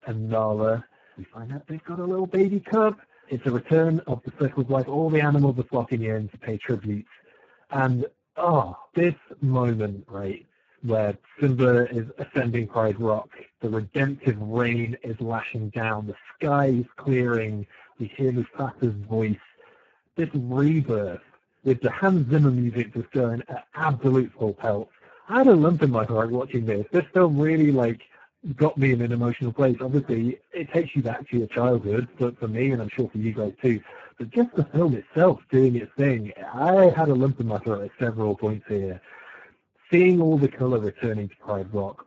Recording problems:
garbled, watery; badly; nothing above 7.5 kHz

